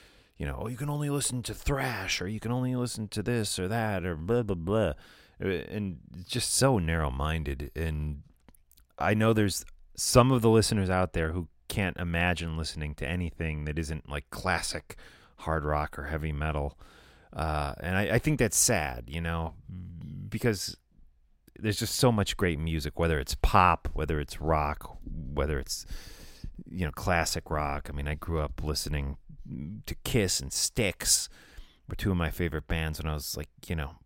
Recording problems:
none

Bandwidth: 16 kHz